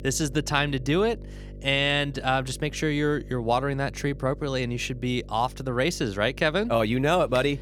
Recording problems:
electrical hum; faint; throughout; 50 Hz, 25 dB below the speech

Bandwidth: 17.5 kHz